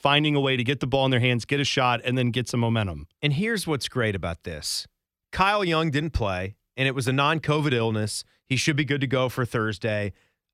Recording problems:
none

